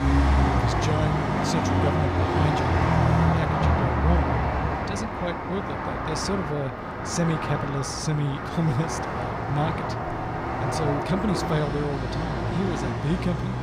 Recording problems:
traffic noise; very loud; throughout; 4 dB above the speech

